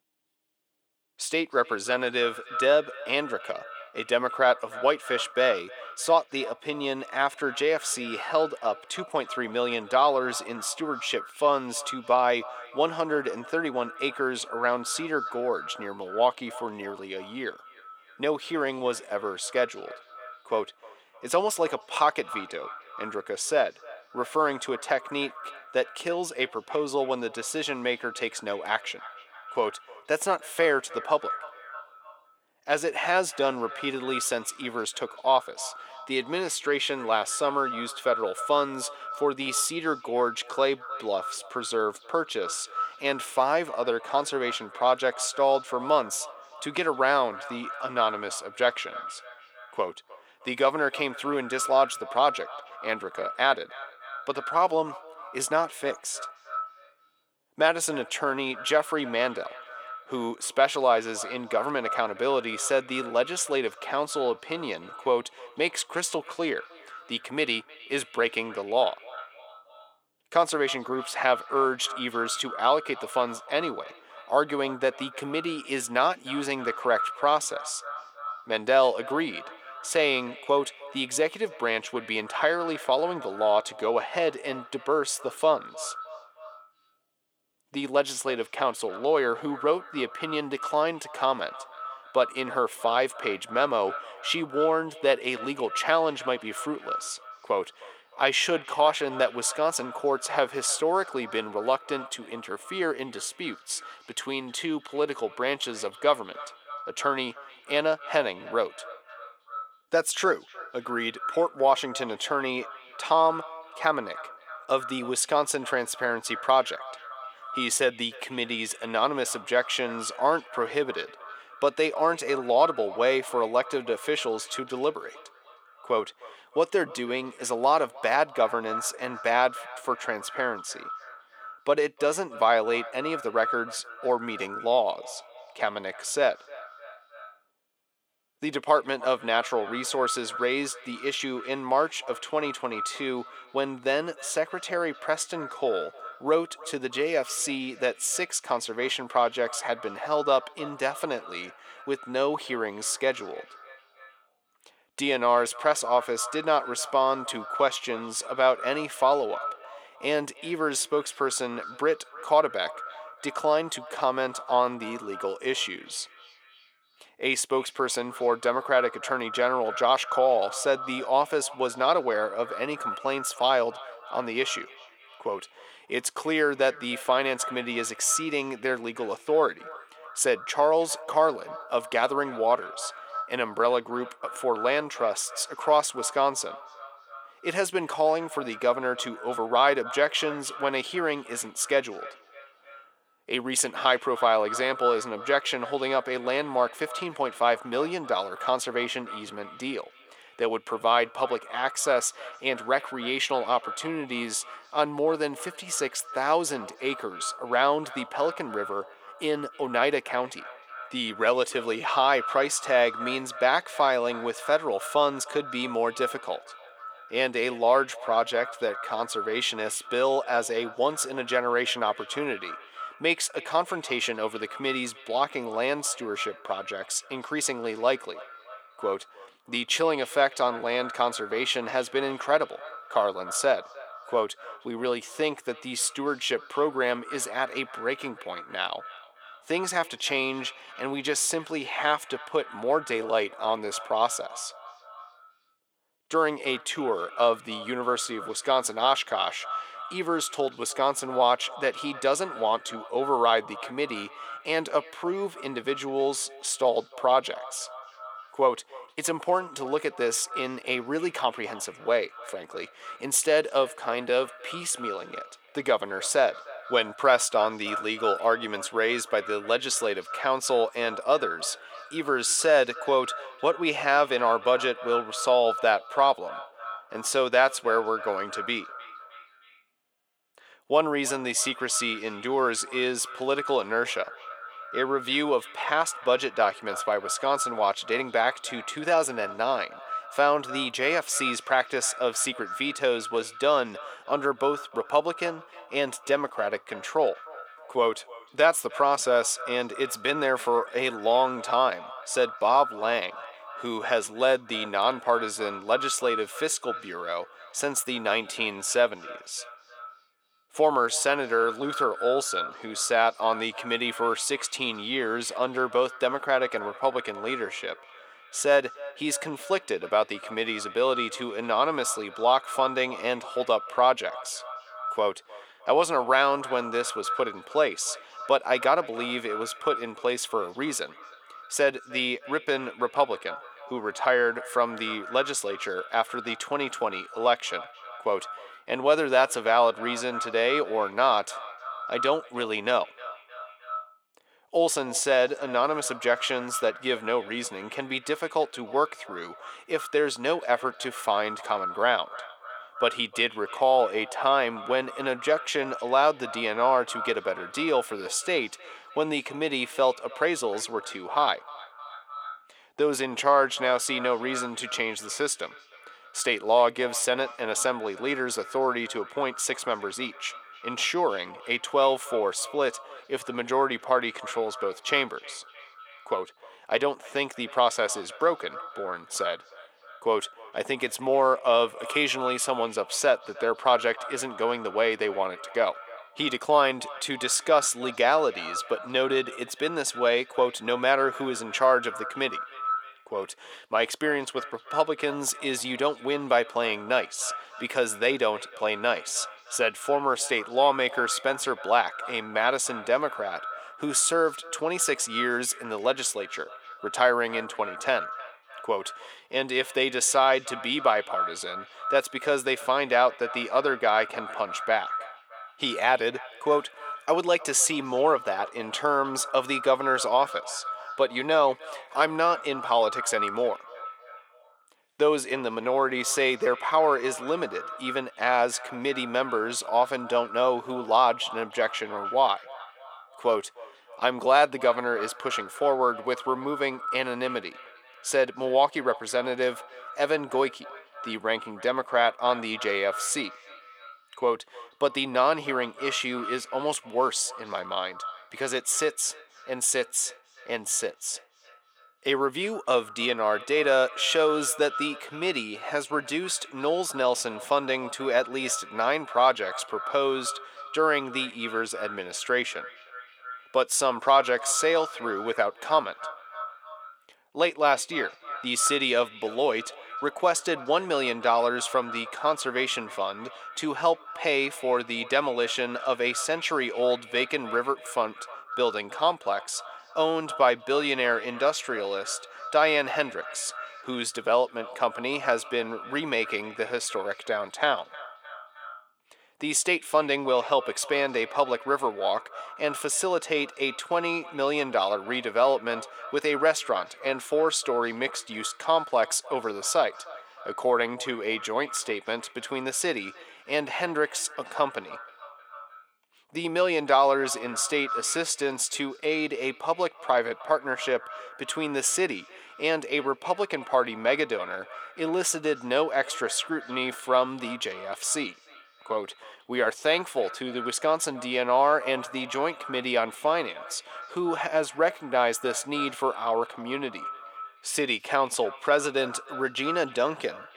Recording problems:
echo of what is said; noticeable; throughout; 310 ms later, 15 dB below the speech
thin; somewhat; fading below 550 Hz

